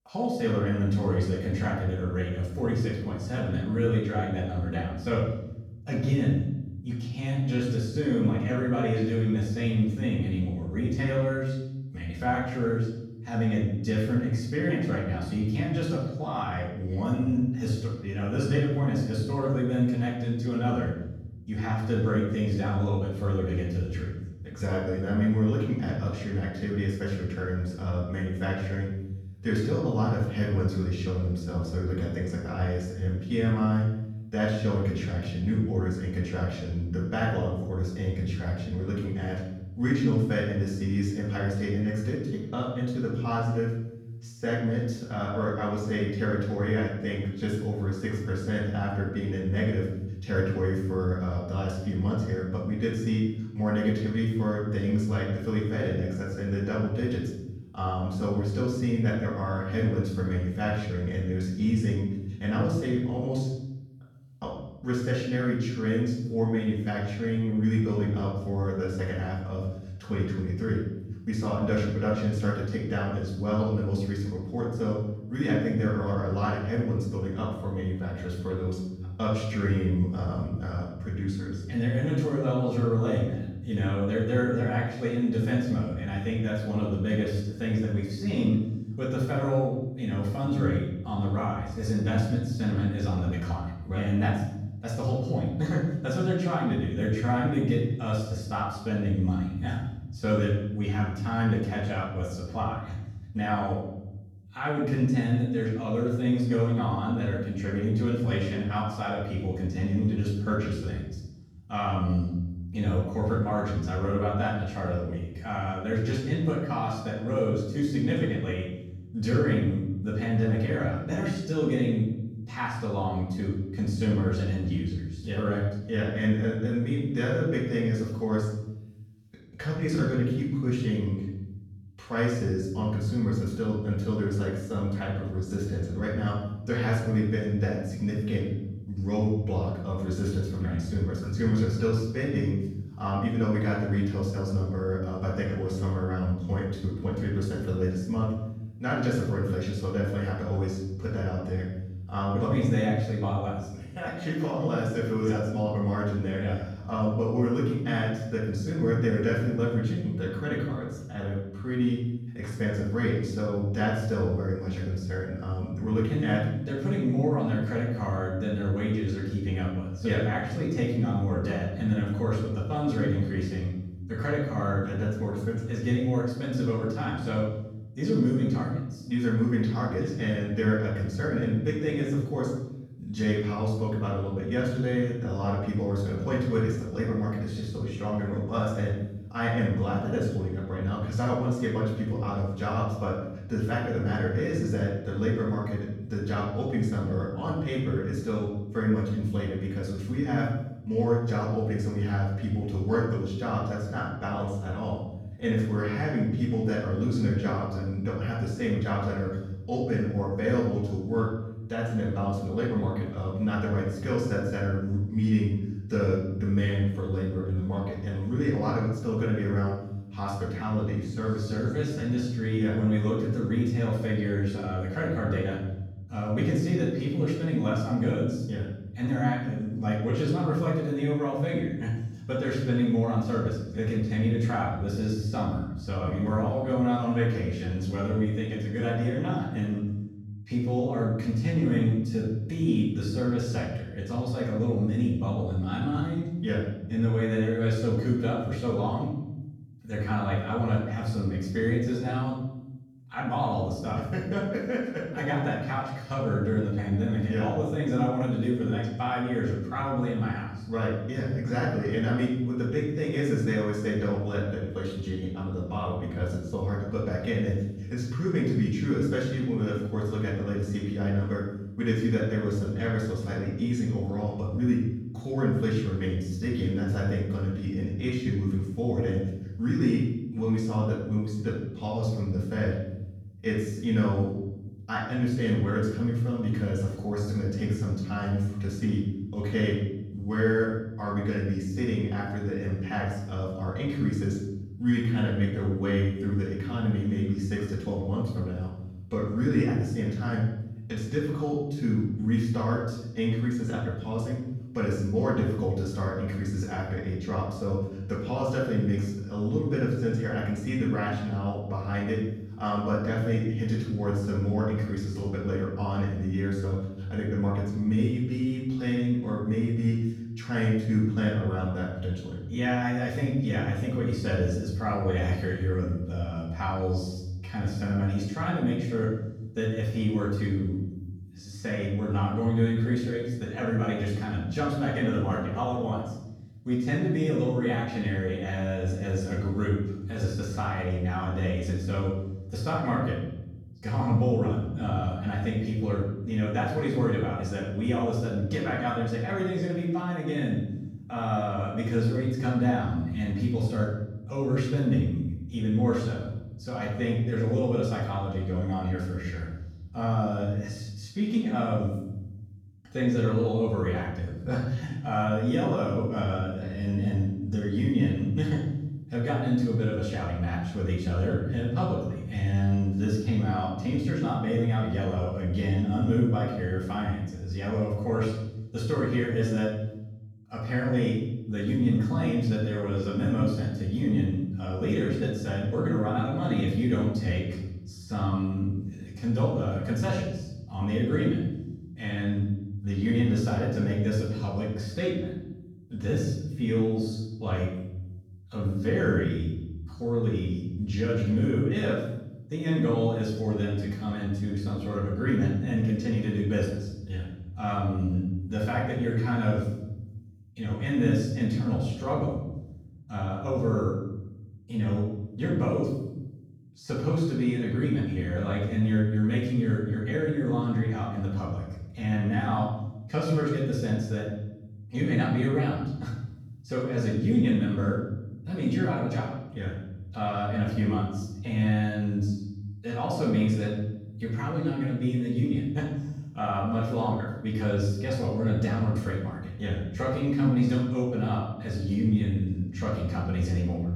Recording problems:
off-mic speech; far
room echo; noticeable; dies away in 1 s

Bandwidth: 17.5 kHz